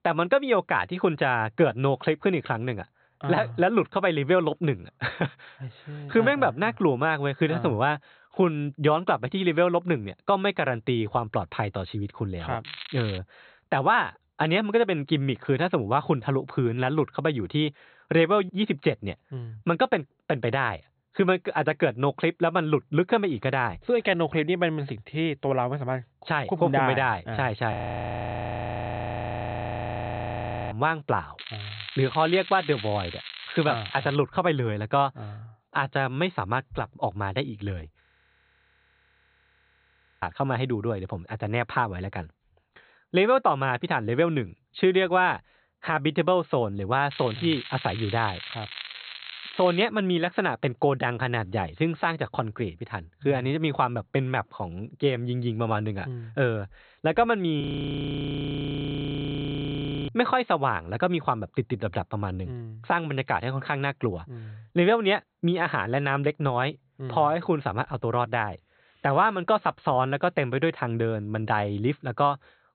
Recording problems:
high frequencies cut off; severe; nothing above 4 kHz
crackling; noticeable; at 13 s, from 31 to 34 s and from 47 to 50 s; 10 dB below the speech
audio freezing; at 28 s for 3 s, at 38 s for 2 s and at 58 s for 2.5 s

